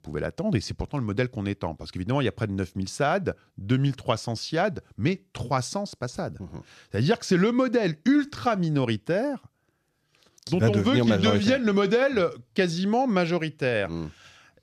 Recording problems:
none

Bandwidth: 14 kHz